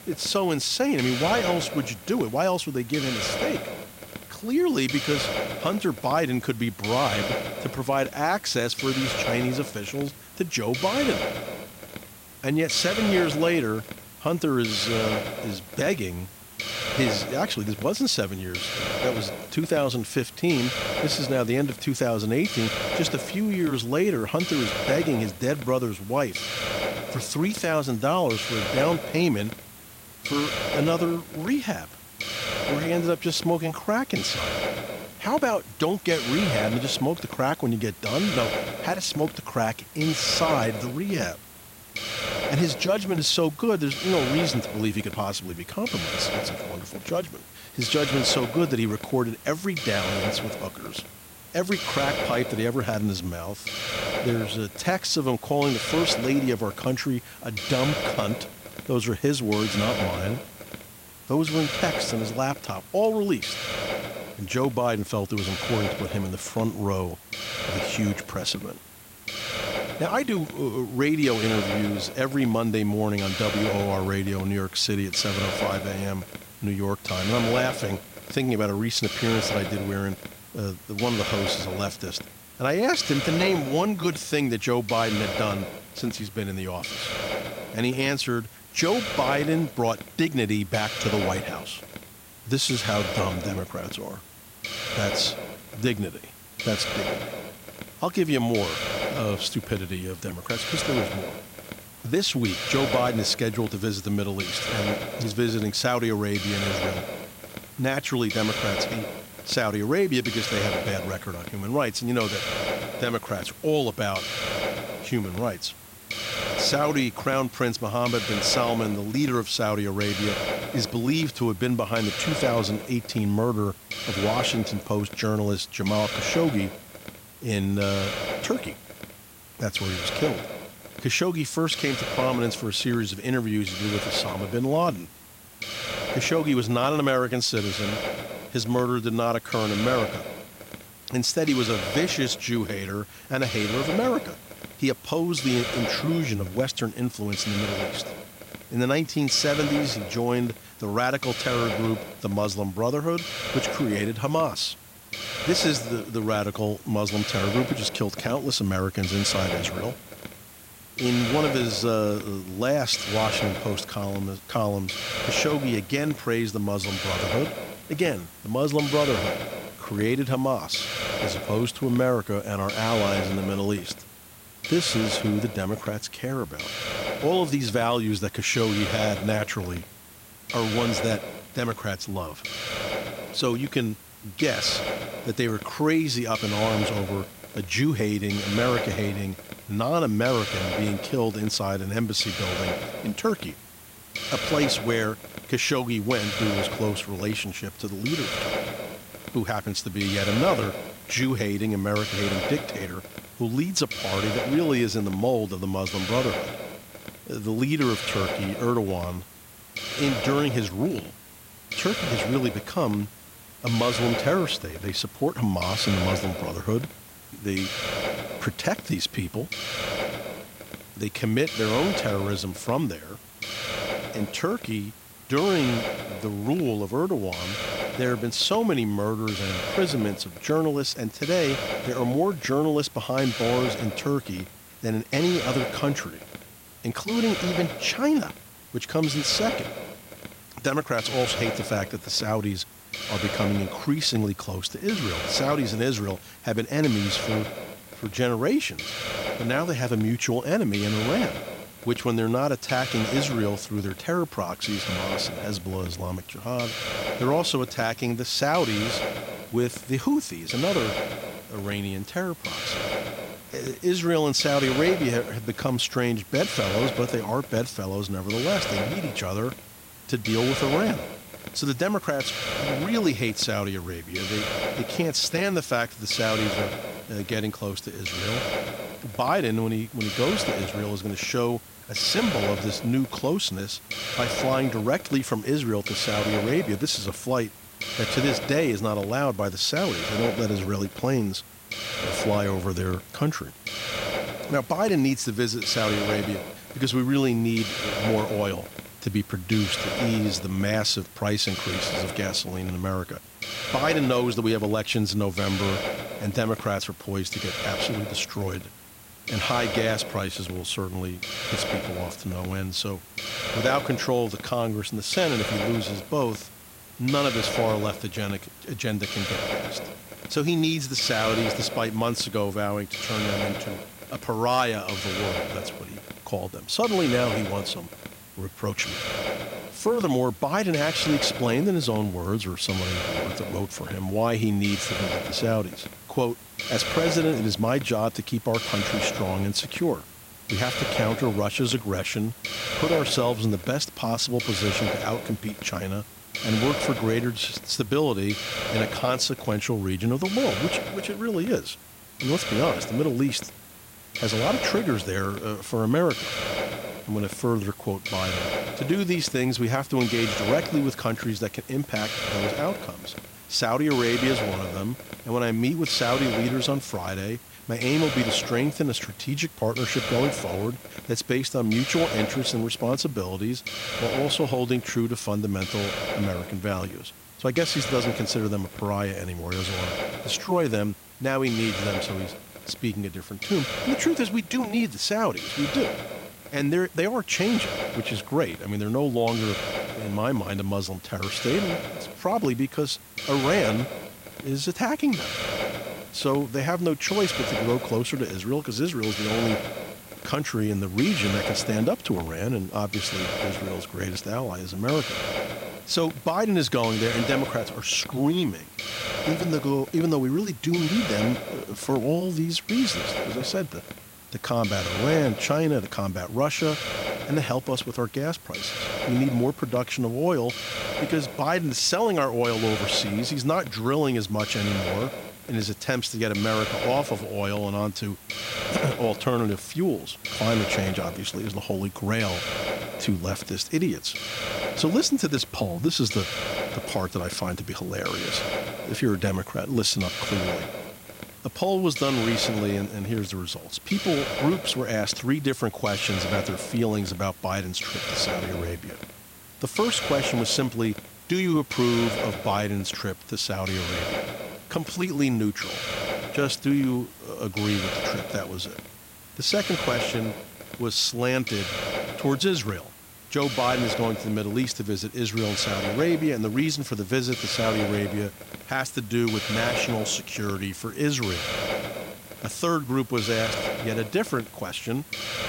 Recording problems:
hiss; loud; throughout; 5 dB below the speech

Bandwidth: 16 kHz